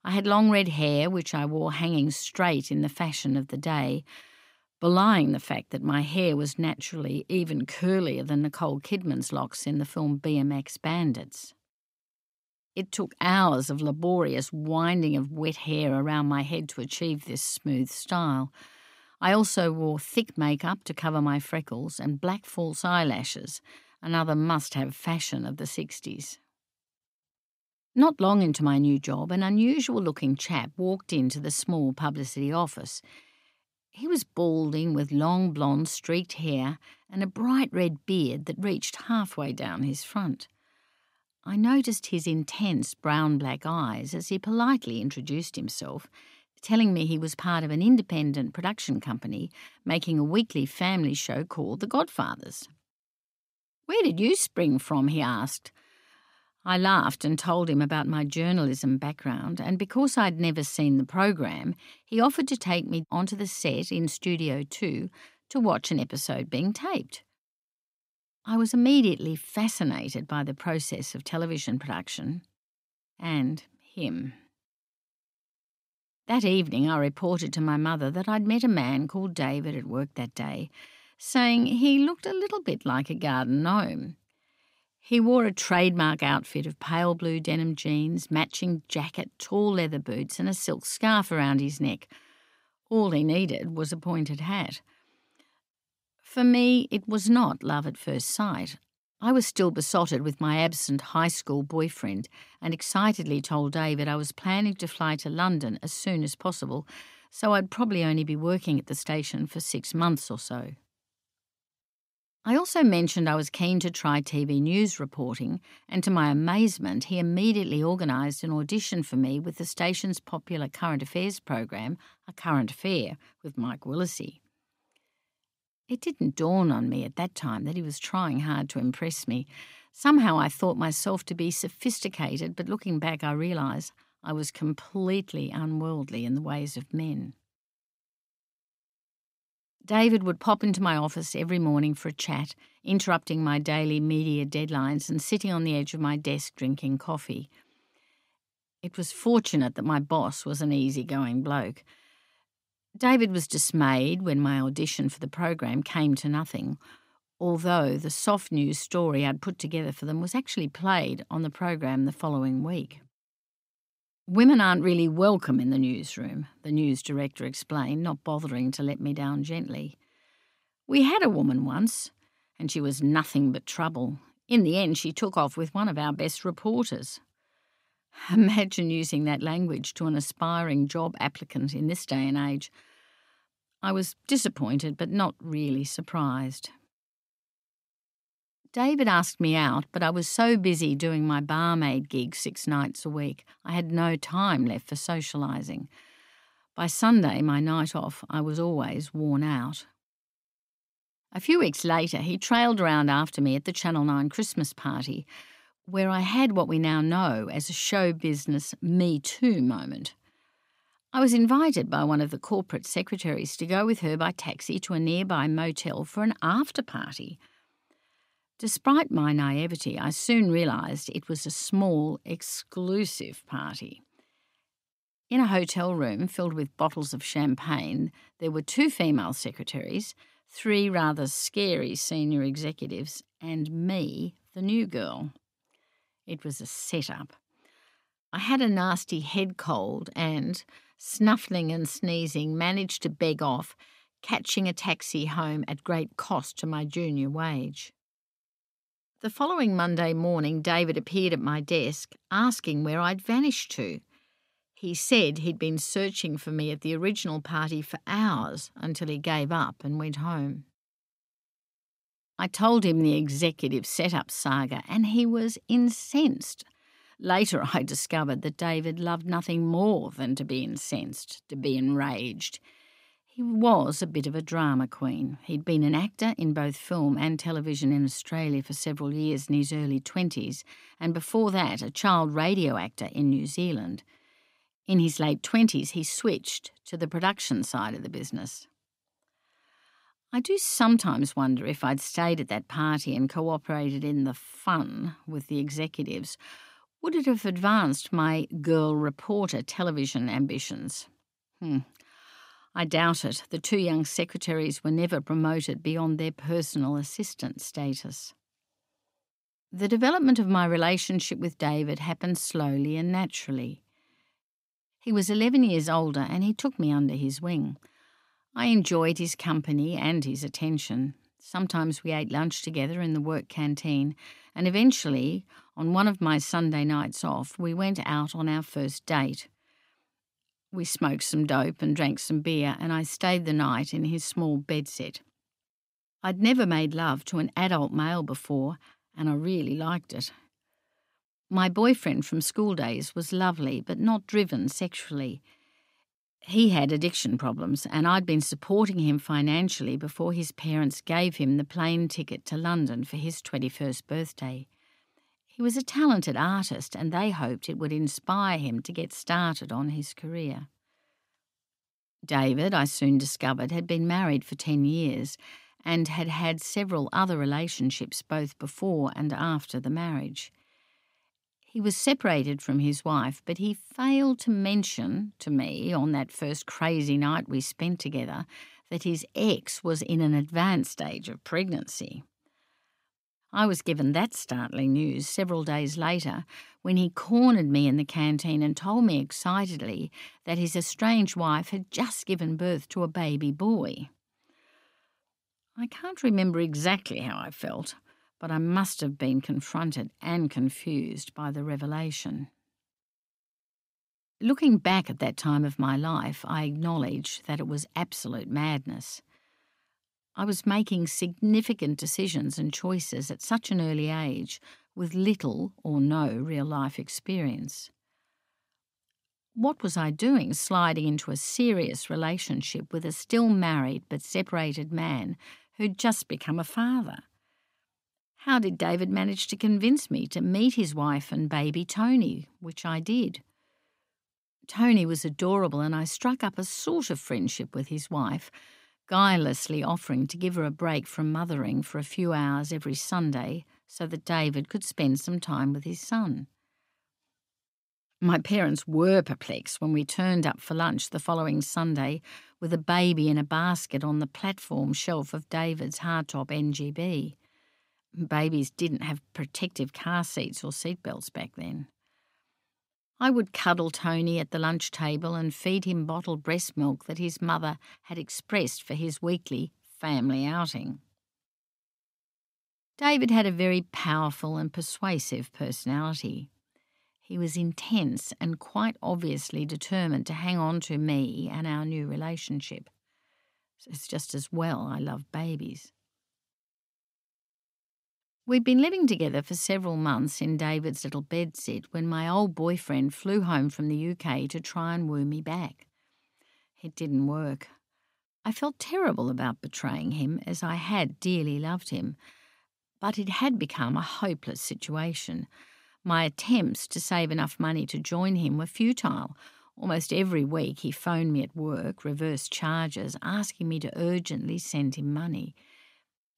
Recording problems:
none

